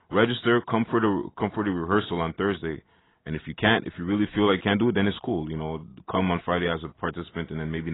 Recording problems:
garbled, watery; badly; nothing above 3.5 kHz
abrupt cut into speech; at the end

